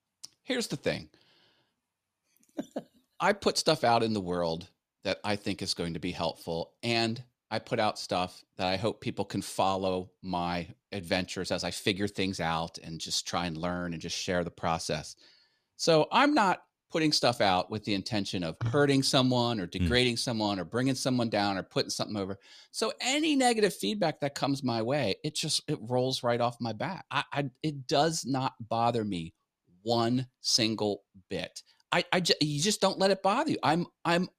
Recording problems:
none

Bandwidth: 14.5 kHz